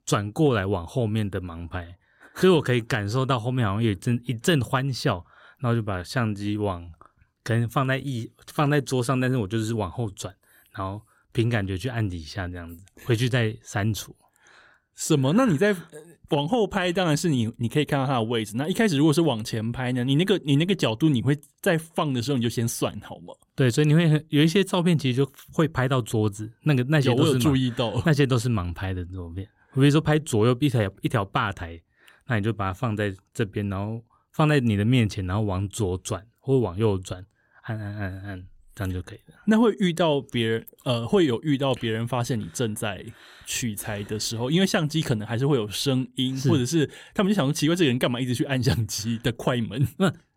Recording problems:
none

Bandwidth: 16 kHz